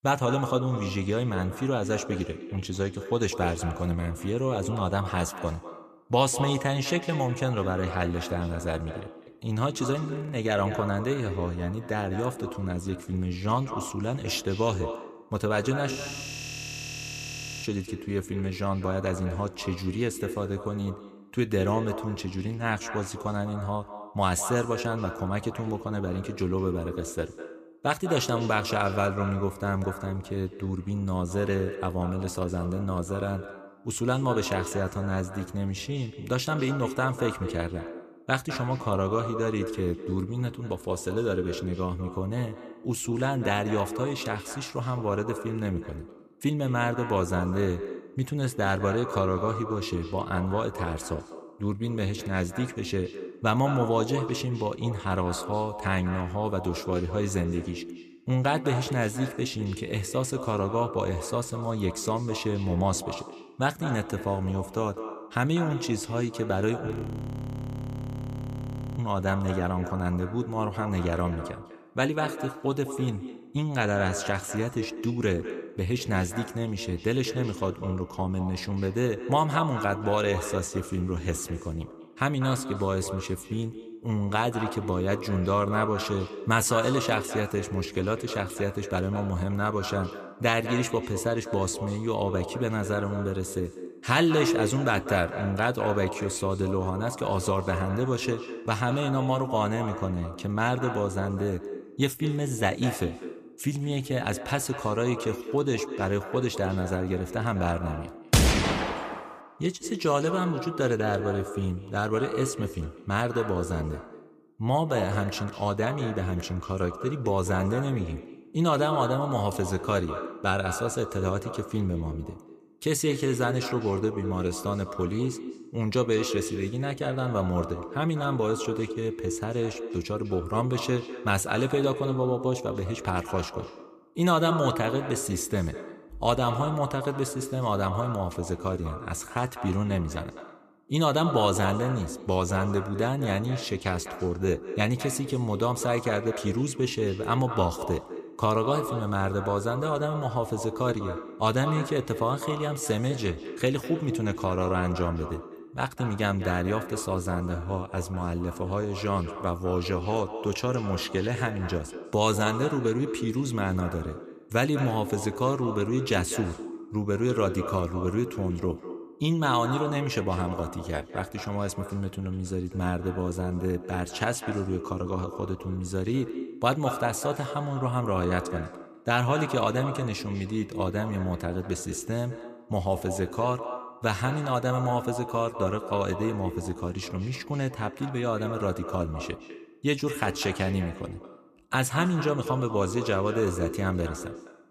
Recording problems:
echo of what is said; strong; throughout; 200 ms later, 9 dB below the speech
audio freezing; at 10 s, at 16 s for 1.5 s and at 1:07 for 2 s

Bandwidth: 14.5 kHz